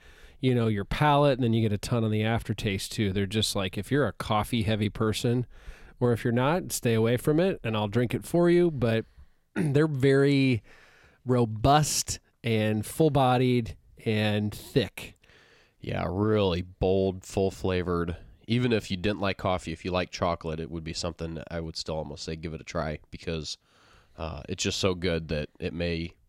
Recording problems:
none

